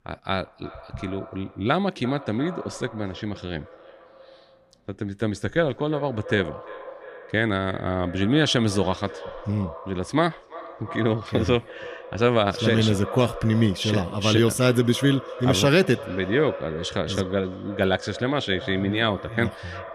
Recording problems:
echo of what is said; noticeable; throughout; 340 ms later, 15 dB below the speech

